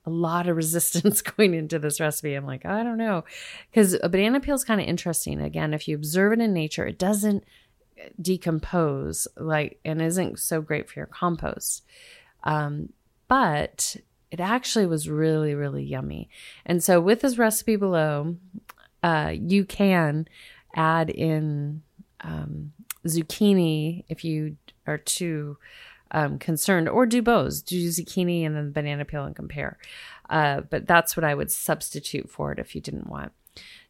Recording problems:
none

